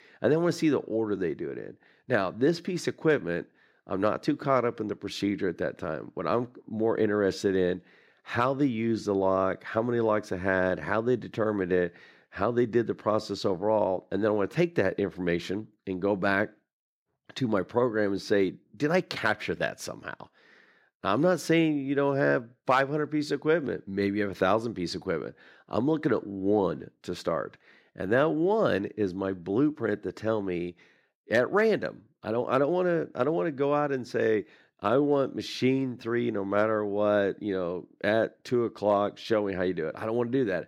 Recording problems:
none

